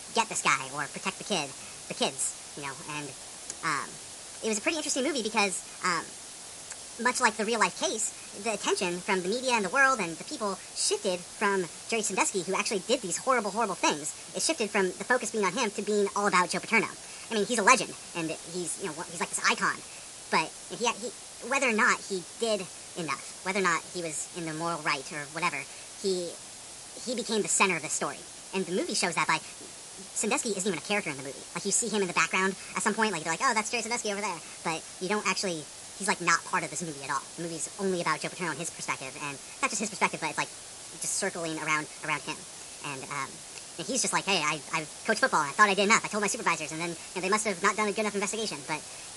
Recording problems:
wrong speed and pitch; too fast and too high; 1.5 times normal speed
garbled, watery; slightly; nothing above 11 kHz
hiss; noticeable; throughout; 15 dB below the speech

